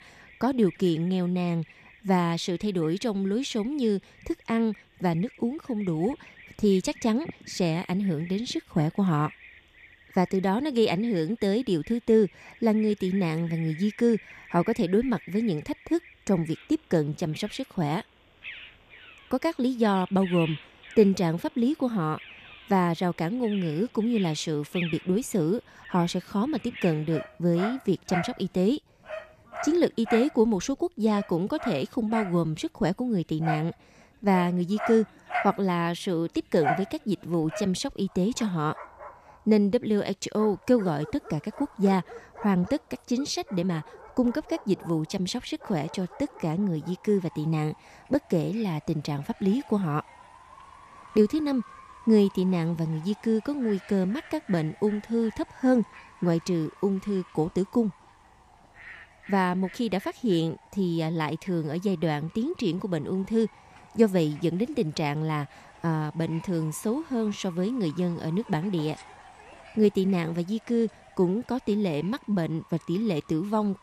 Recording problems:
animal sounds; noticeable; throughout; 15 dB below the speech

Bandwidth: 14.5 kHz